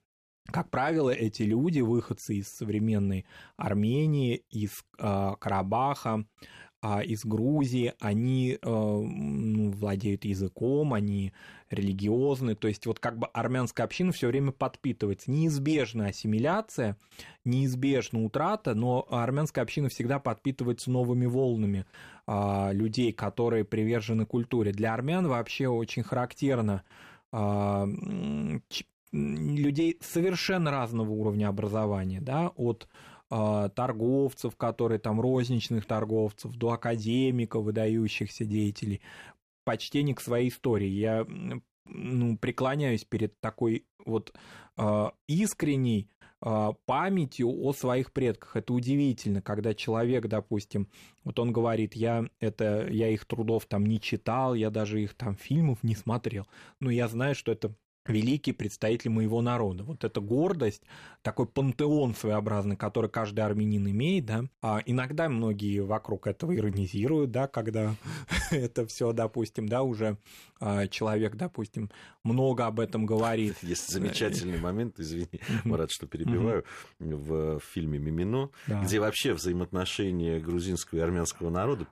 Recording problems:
none

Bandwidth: 14.5 kHz